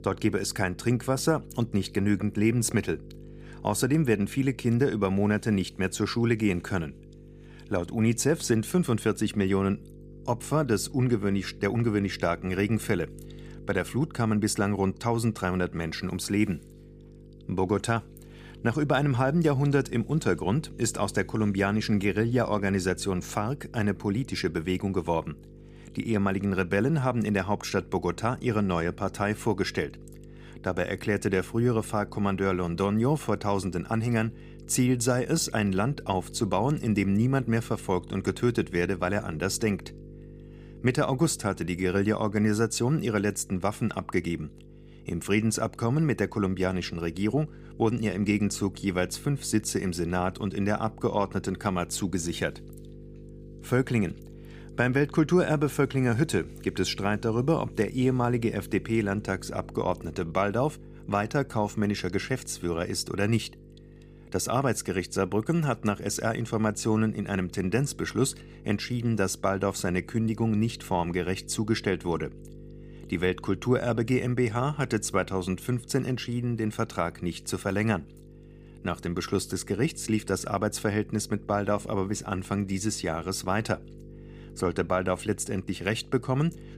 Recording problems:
electrical hum; faint; throughout; 50 Hz, 25 dB below the speech

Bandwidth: 15 kHz